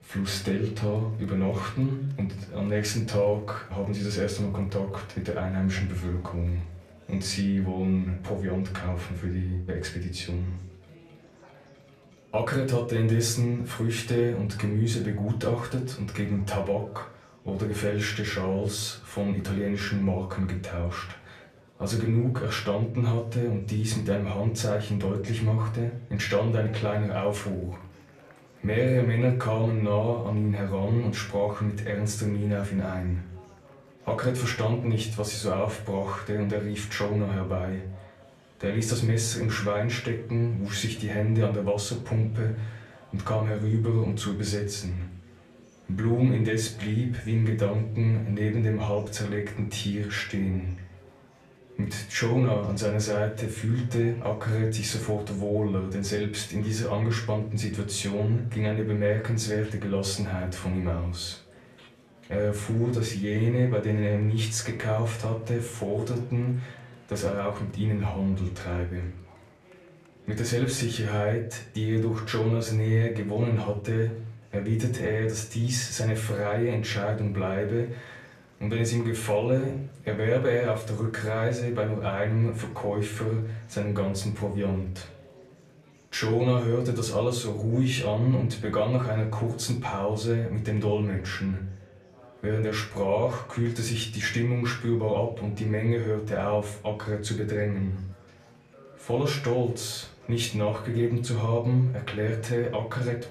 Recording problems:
off-mic speech; far
room echo; slight; dies away in 0.4 s
murmuring crowd; faint; throughout; 25 dB below the speech

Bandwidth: 14.5 kHz